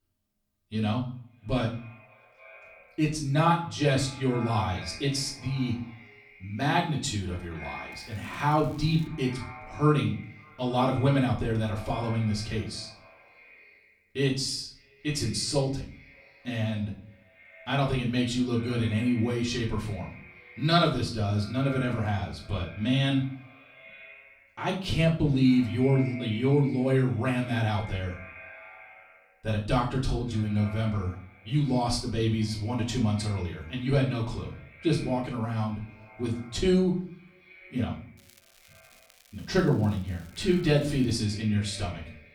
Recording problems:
off-mic speech; far
echo of what is said; faint; throughout; 270 ms later, 20 dB below the speech
room echo; slight; dies away in 0.4 s
crackling; faint; from 8 to 9 s and from 38 to 41 s; 30 dB below the speech

